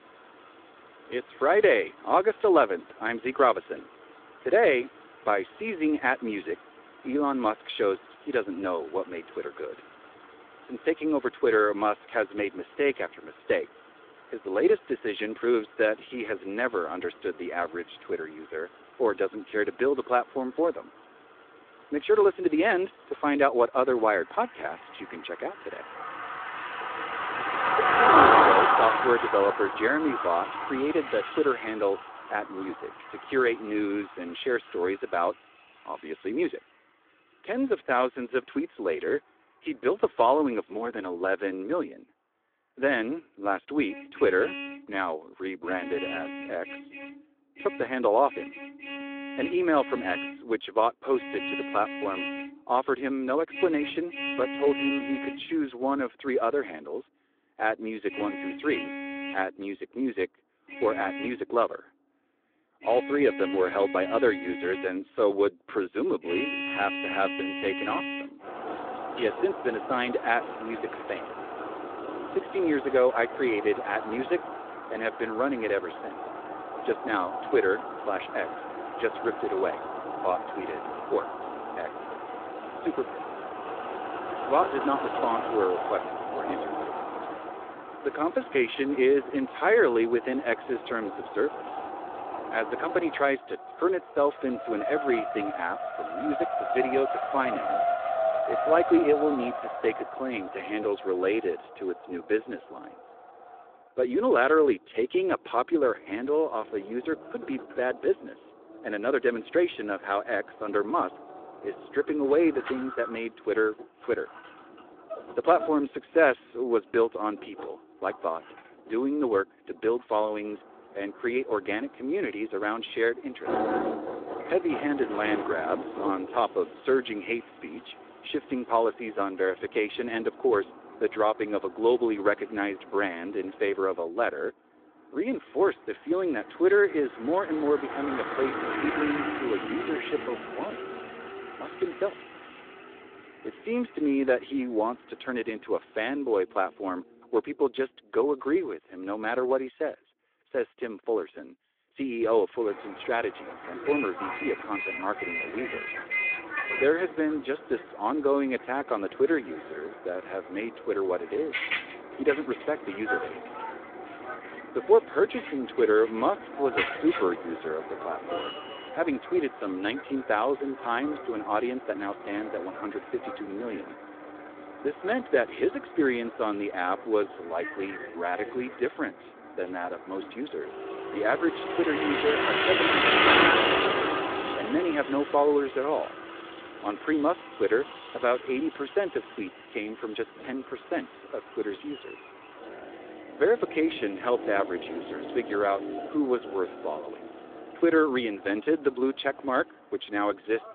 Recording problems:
phone-call audio; nothing above 3.5 kHz
traffic noise; loud; throughout; 3 dB below the speech

